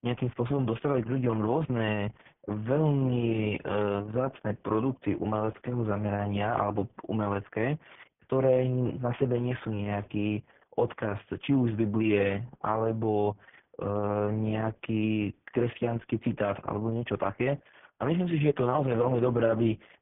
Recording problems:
garbled, watery; badly
high frequencies cut off; severe; nothing above 3.5 kHz

